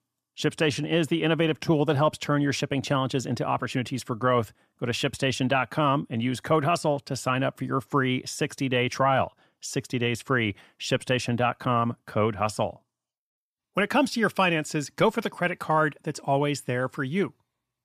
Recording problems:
none

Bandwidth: 14.5 kHz